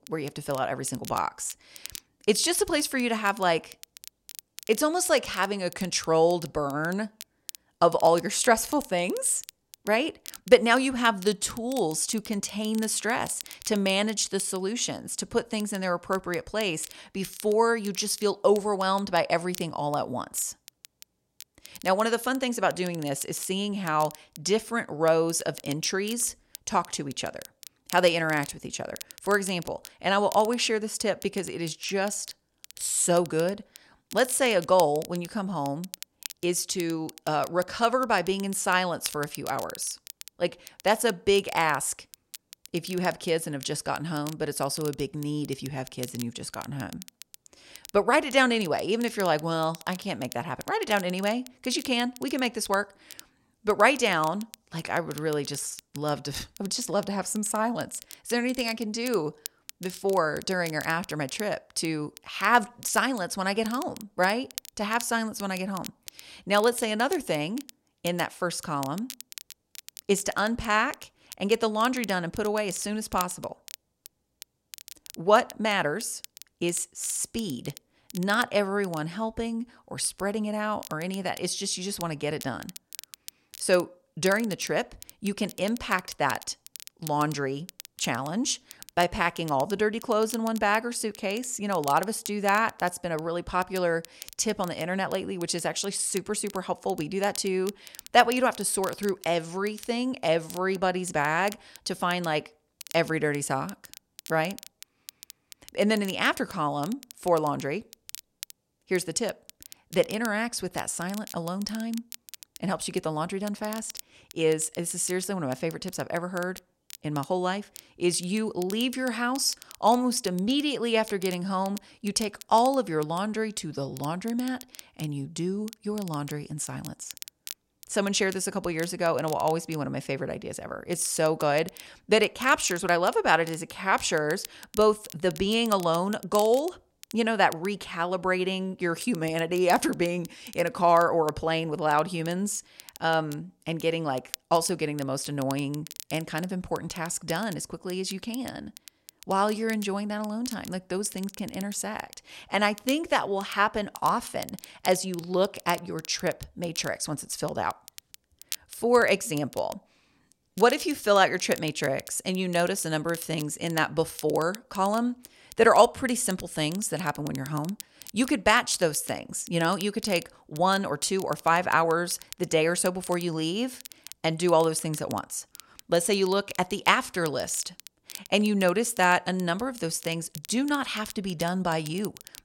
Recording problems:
crackle, like an old record; noticeable; 20 dB below the speech

